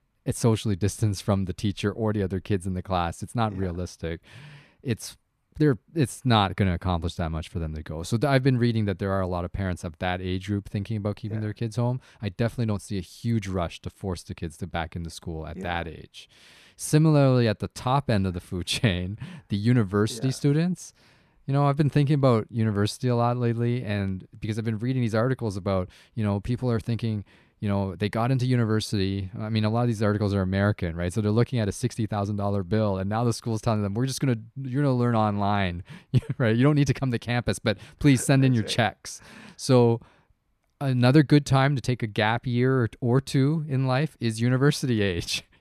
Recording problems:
none

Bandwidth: 14 kHz